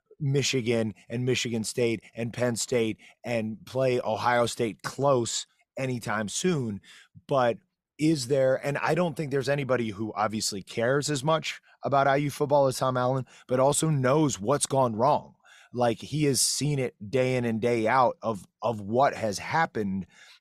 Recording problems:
none

